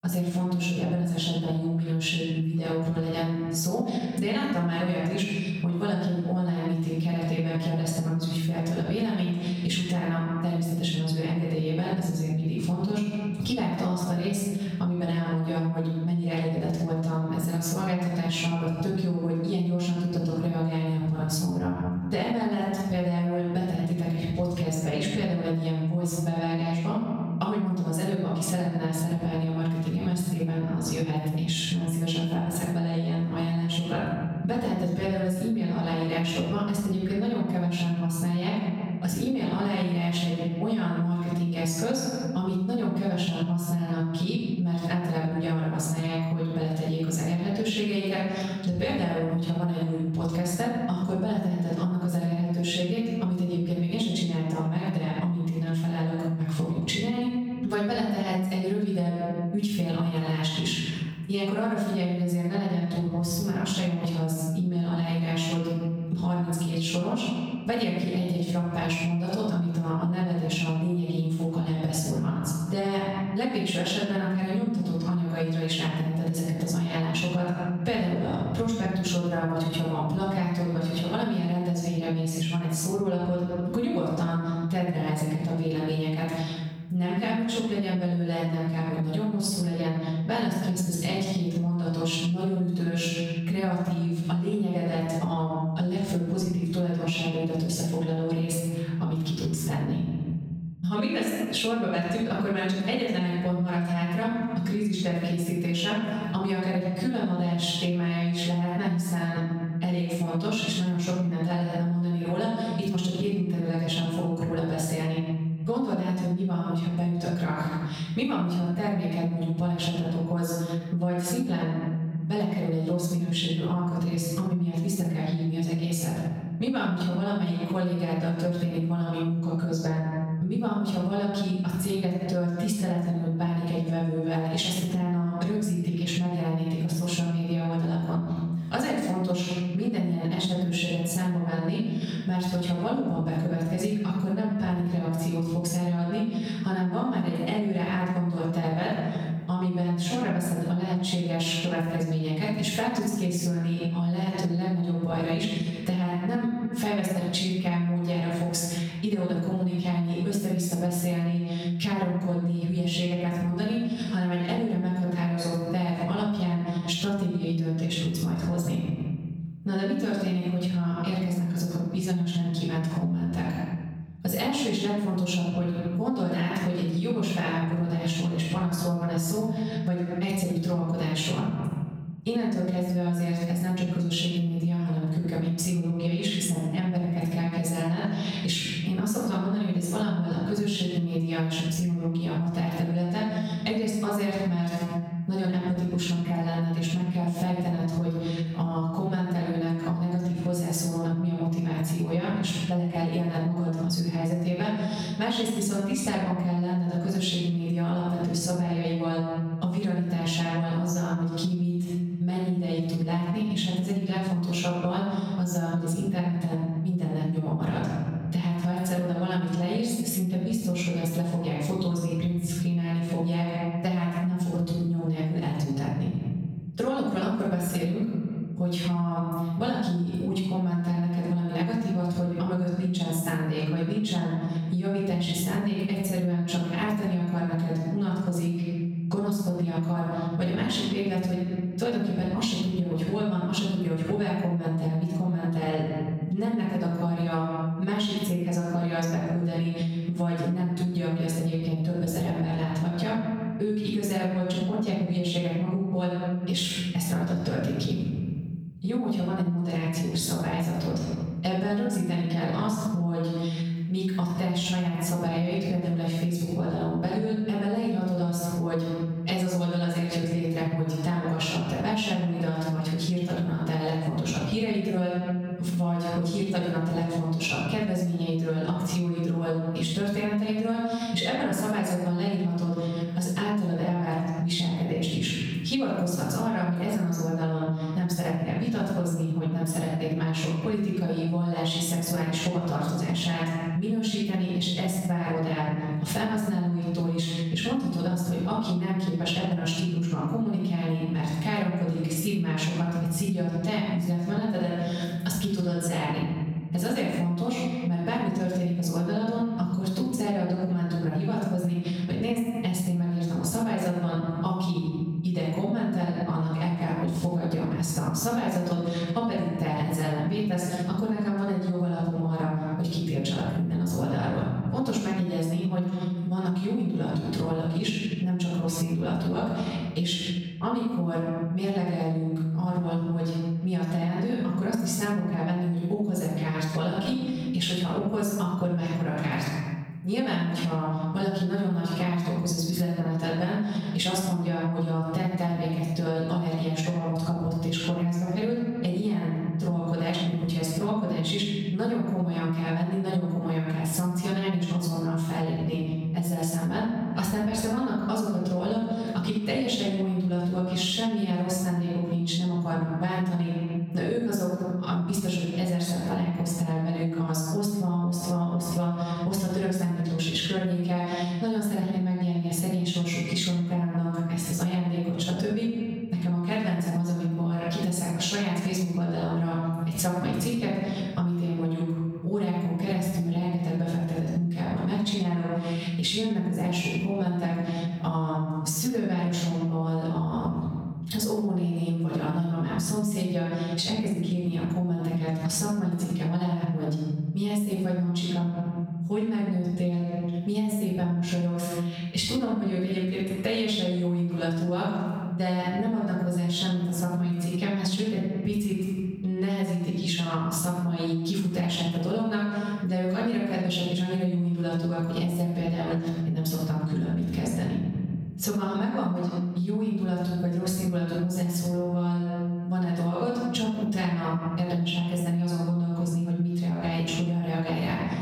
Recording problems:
off-mic speech; far
room echo; noticeable; dies away in 1.1 s
squashed, flat; somewhat

